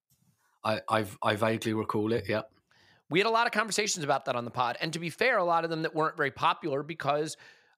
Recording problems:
none

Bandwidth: 15.5 kHz